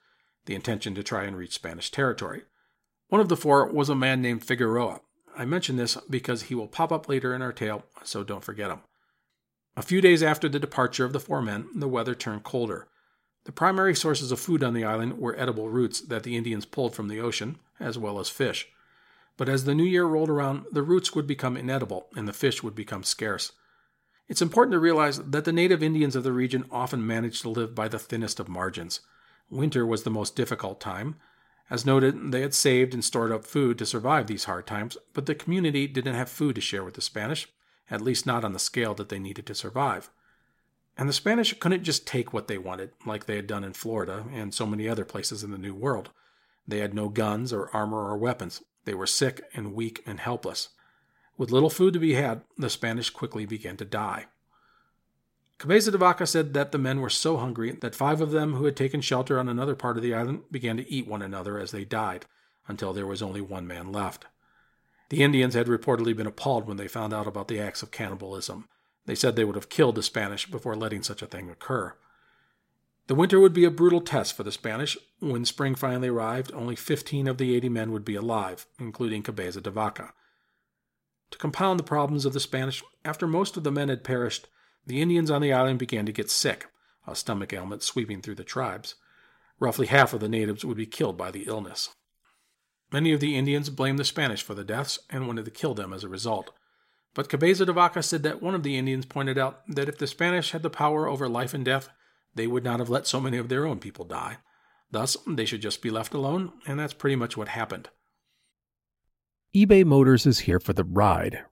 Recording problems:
none

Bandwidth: 16 kHz